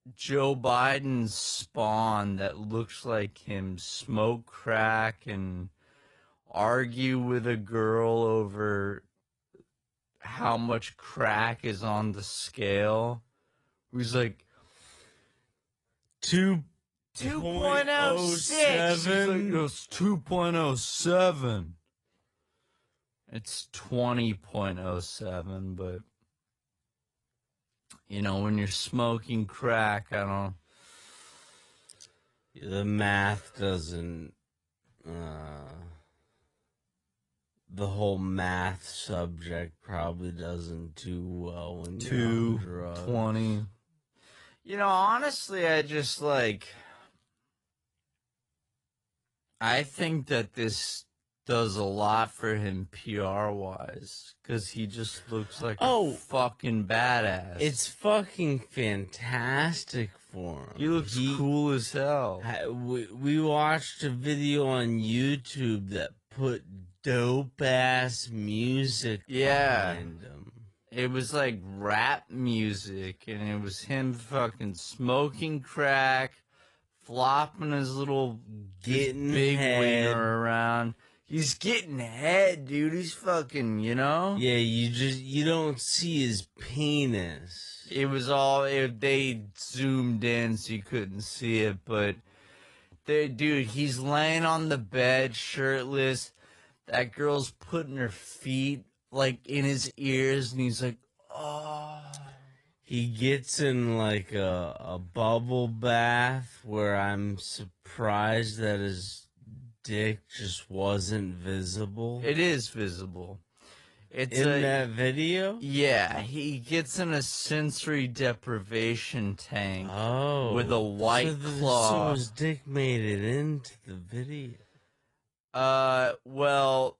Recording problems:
wrong speed, natural pitch; too slow; 0.5 times normal speed
garbled, watery; slightly; nothing above 10.5 kHz

